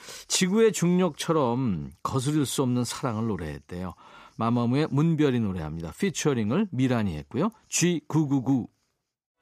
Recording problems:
none

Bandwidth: 14.5 kHz